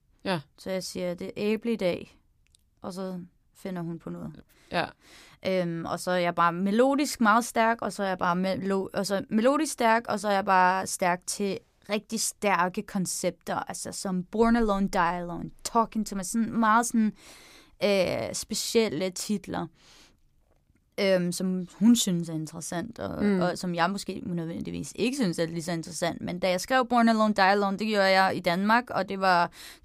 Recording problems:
none

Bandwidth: 15 kHz